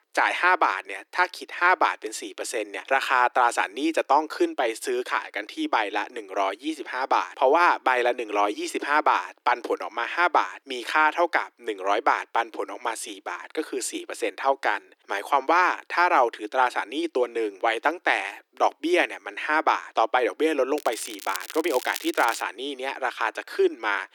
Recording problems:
thin; very; fading below 300 Hz
crackling; noticeable; from 21 to 22 s; 10 dB below the speech

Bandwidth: 18.5 kHz